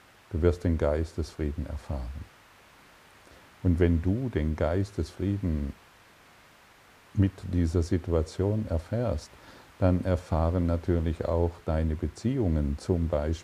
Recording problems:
hiss; faint; throughout; 25 dB below the speech

